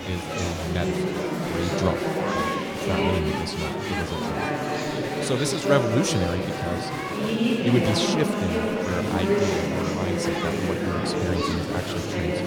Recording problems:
chatter from many people; very loud; throughout; 3 dB above the speech

